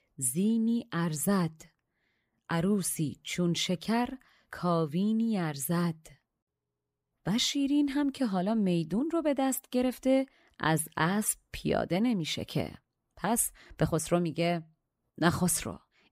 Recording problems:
none

